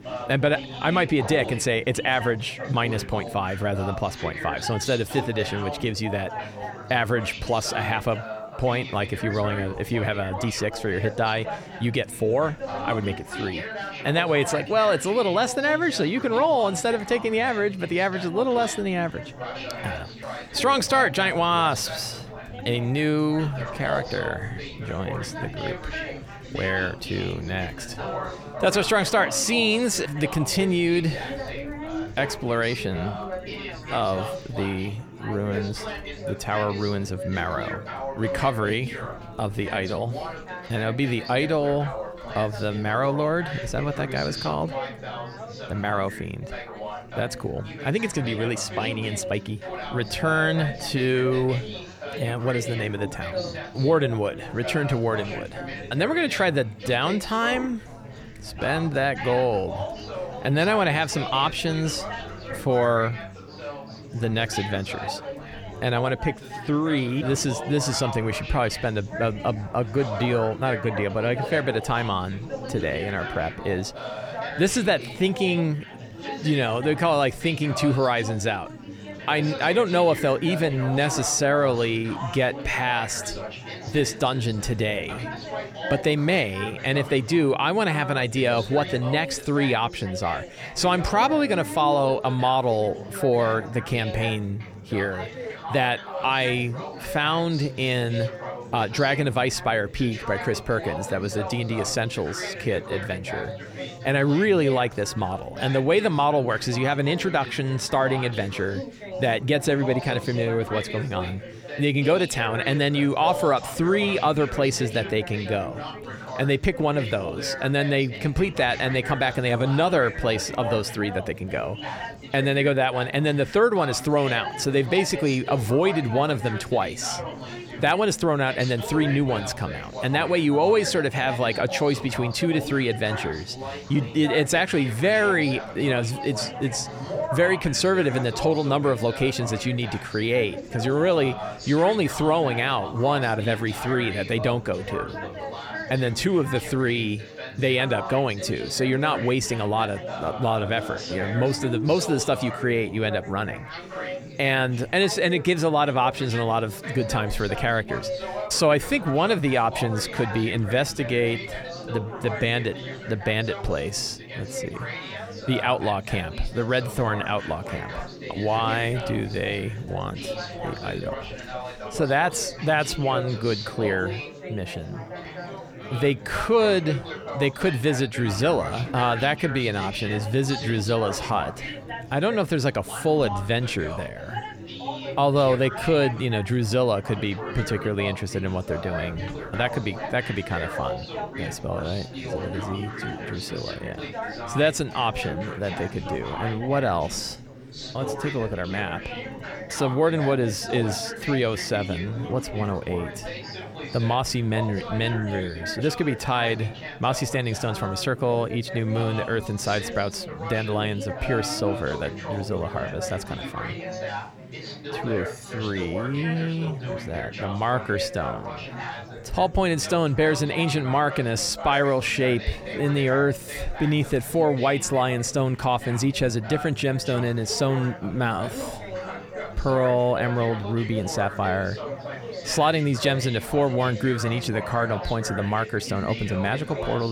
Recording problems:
chatter from many people; loud; throughout; 10 dB below the speech
abrupt cut into speech; at the end

